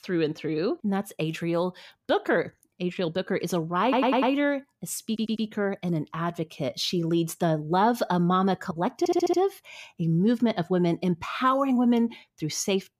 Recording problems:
audio stuttering; at 4 s, at 5 s and at 9 s

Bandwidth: 15 kHz